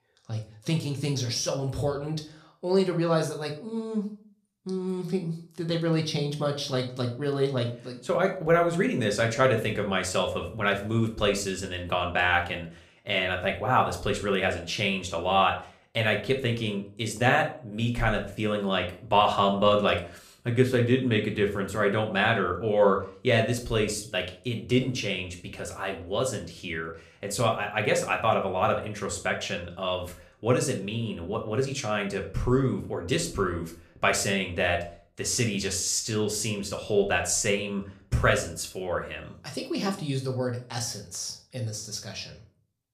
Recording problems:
room echo; slight; dies away in 0.4 s
off-mic speech; somewhat distant

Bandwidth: 14.5 kHz